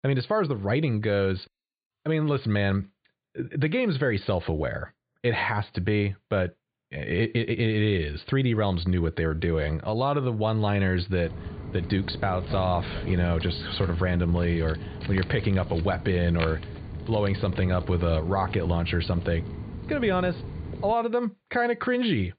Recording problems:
high frequencies cut off; severe; nothing above 4.5 kHz
footsteps; noticeable; from 11 to 21 s; peak 7 dB below the speech

